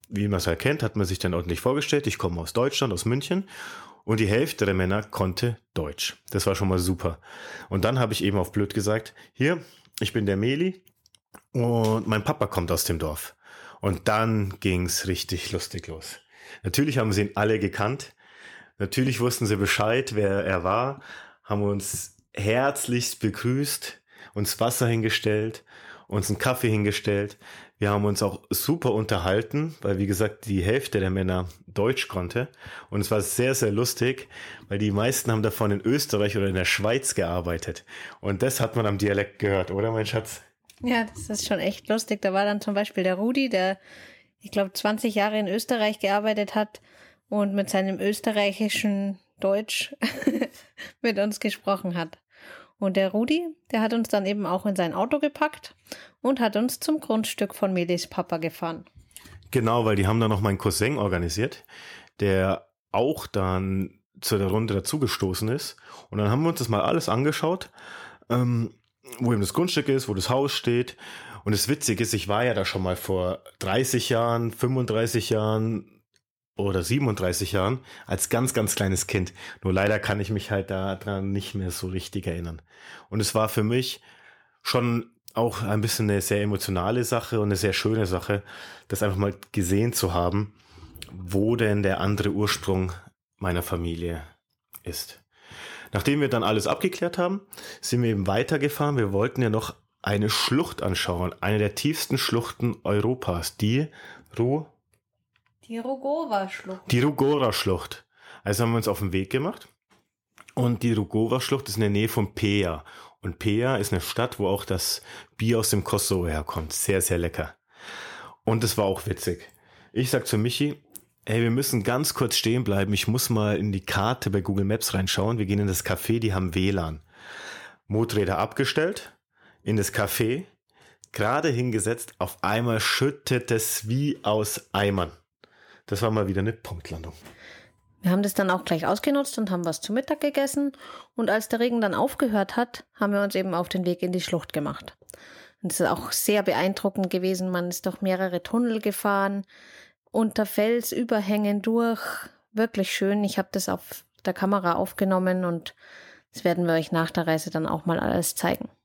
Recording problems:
none

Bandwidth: 18.5 kHz